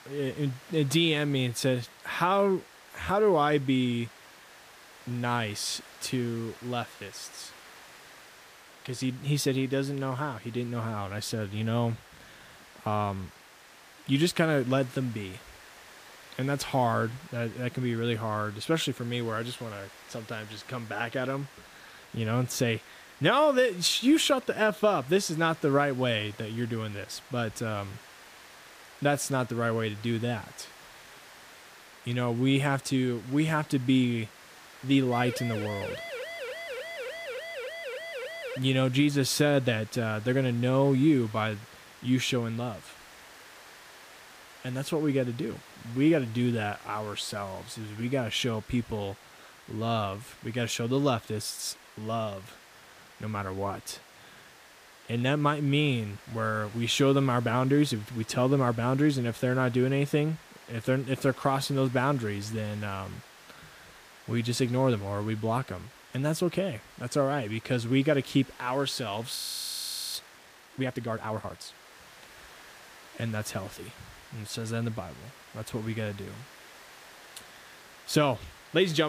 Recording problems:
hiss; faint; throughout; 20 dB below the speech
siren; noticeable; from 35 to 39 s; peak 8 dB below the speech
audio freezing; at 1:09 for 1 s
abrupt cut into speech; at the end

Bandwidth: 15 kHz